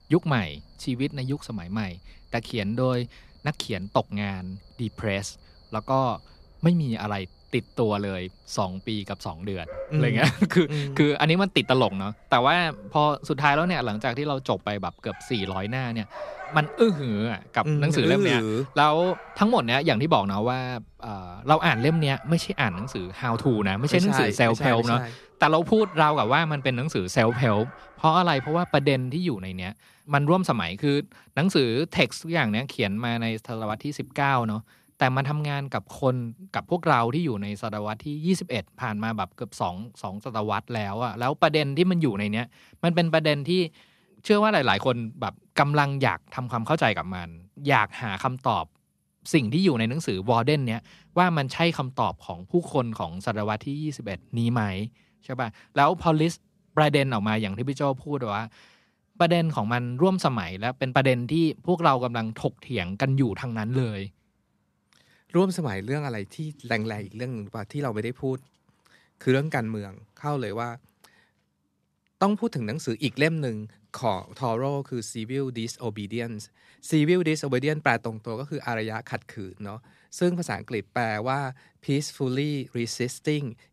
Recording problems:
animal sounds; faint; throughout; 20 dB below the speech

